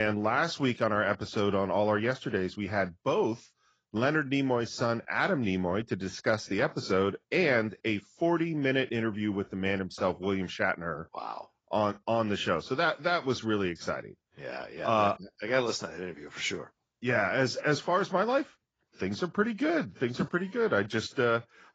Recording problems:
garbled, watery; badly; nothing above 7.5 kHz
abrupt cut into speech; at the start

